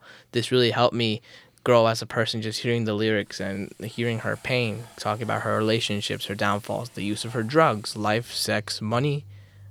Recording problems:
household noises; faint; from 3 s on; 25 dB below the speech

